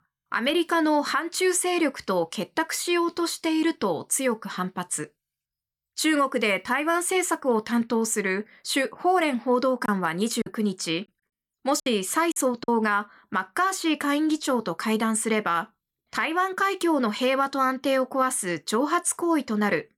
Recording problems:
choppy; very; from 10 to 13 s; 7% of the speech affected

